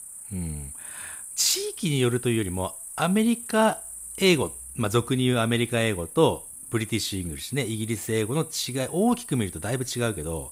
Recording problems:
animal sounds; noticeable; throughout; 10 dB below the speech

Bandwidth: 15.5 kHz